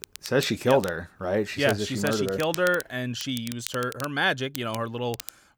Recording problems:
crackle, like an old record; noticeable; 15 dB below the speech

